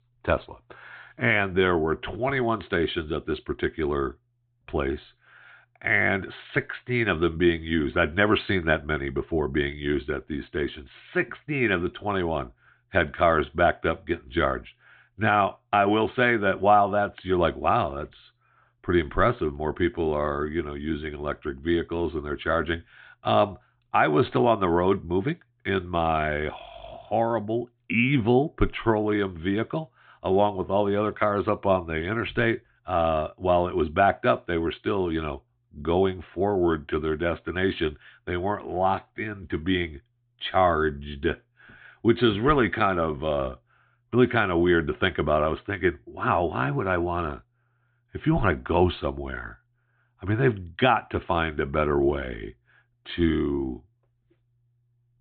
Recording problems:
high frequencies cut off; severe; nothing above 4 kHz

